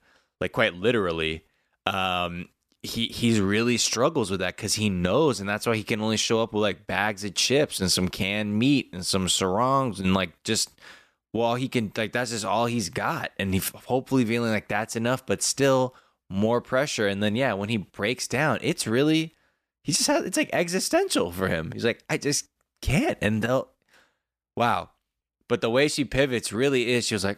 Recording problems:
none

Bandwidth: 14.5 kHz